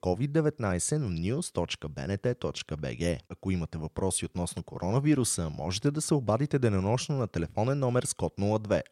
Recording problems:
none

